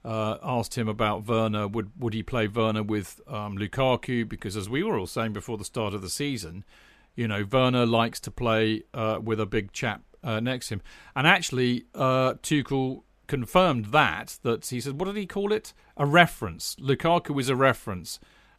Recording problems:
none

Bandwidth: 14.5 kHz